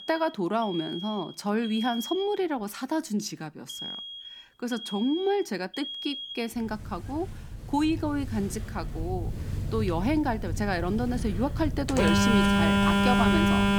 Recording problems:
alarms or sirens; very loud; throughout; 1 dB above the speech

